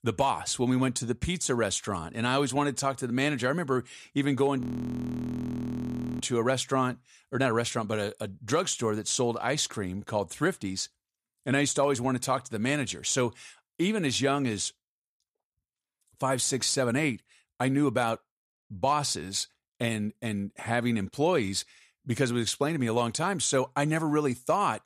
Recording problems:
audio freezing; at 4.5 s for 1.5 s

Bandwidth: 14 kHz